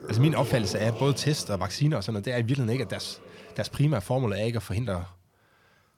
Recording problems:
household noises; noticeable; throughout; 10 dB below the speech

